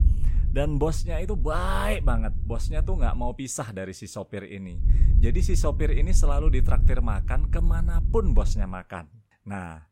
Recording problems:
low rumble; noticeable; until 3 s and from 5 to 8.5 s; 15 dB below the speech

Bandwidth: 16 kHz